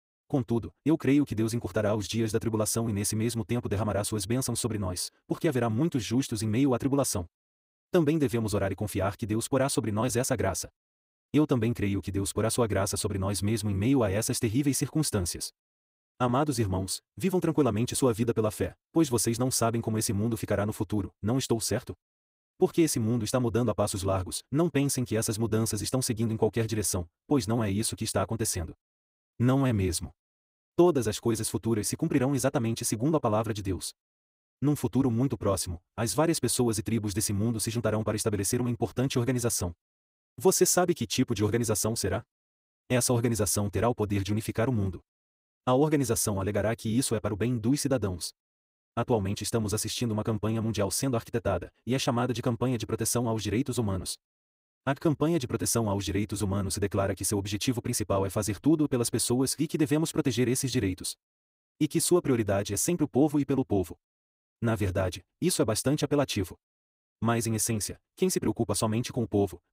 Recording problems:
wrong speed, natural pitch; too fast; 1.5 times normal speed

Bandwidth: 15.5 kHz